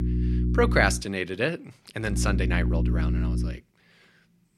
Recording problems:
electrical hum; noticeable; at the start and from 2 to 3.5 s; 60 Hz, 10 dB below the speech

